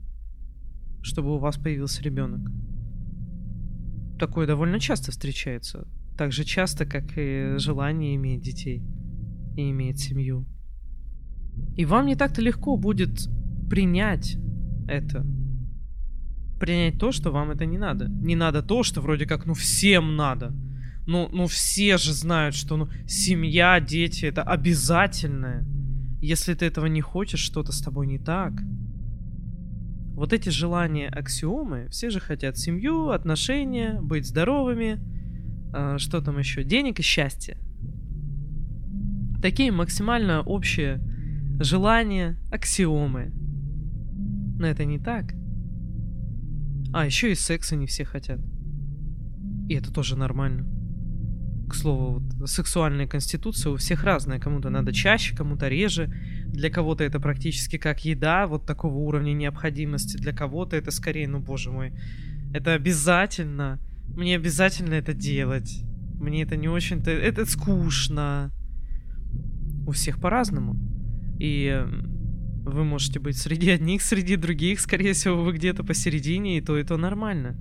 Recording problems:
low rumble; noticeable; throughout; 20 dB below the speech

